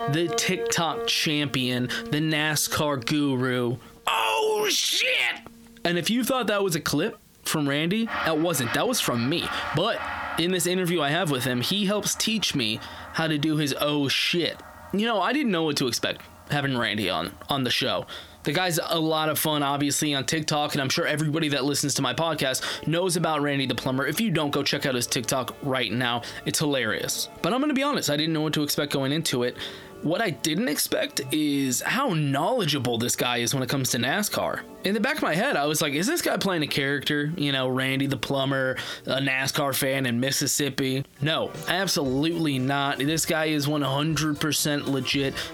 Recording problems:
squashed, flat; heavily, background pumping
background music; noticeable; throughout; 15 dB below the speech

